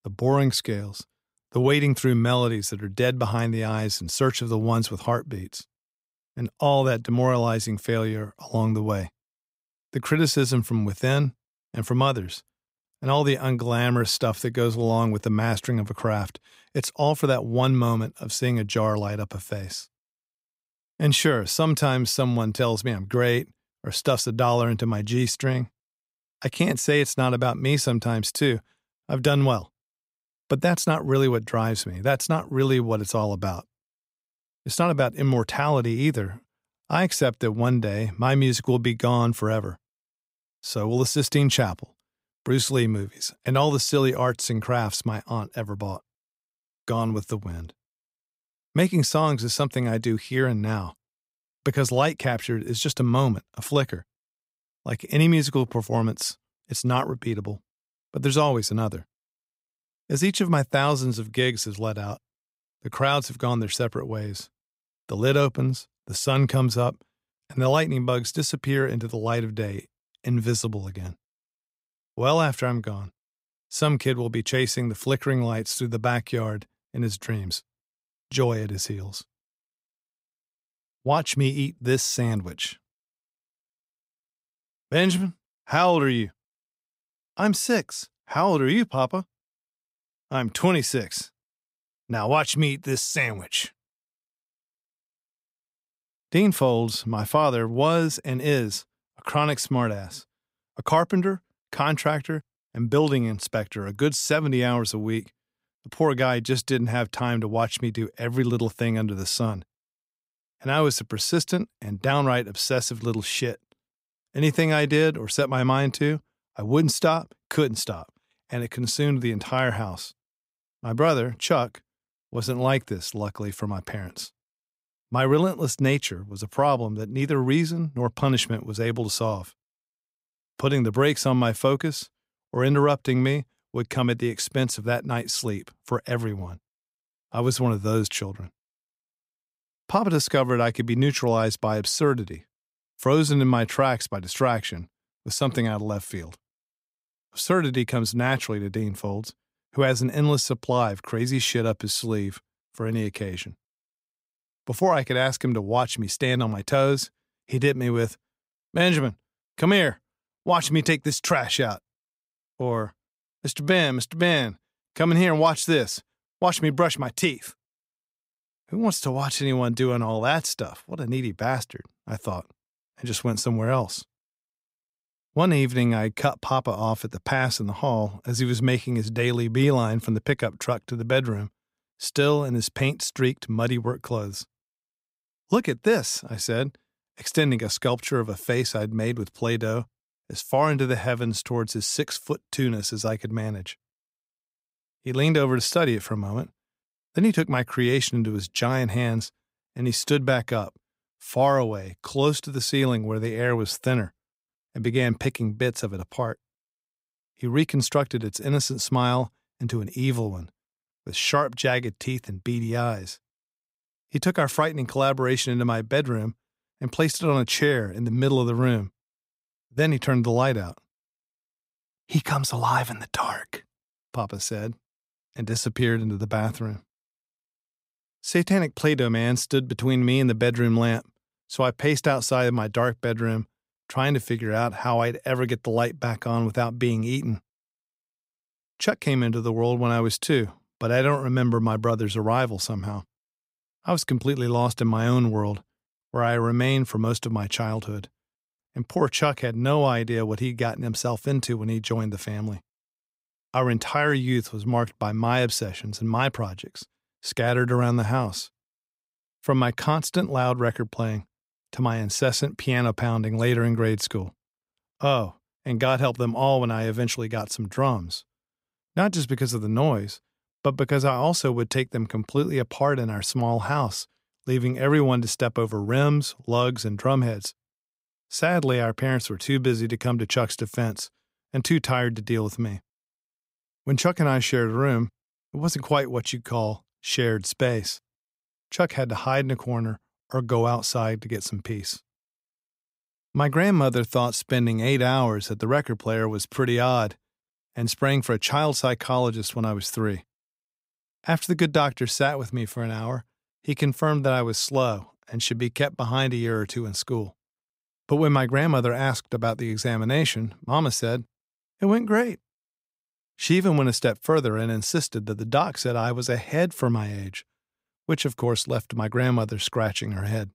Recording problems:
none

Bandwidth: 15.5 kHz